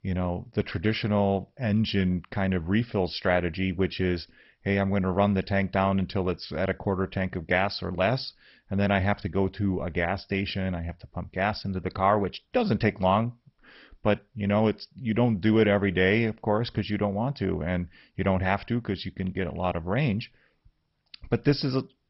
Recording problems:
garbled, watery; badly; nothing above 5.5 kHz

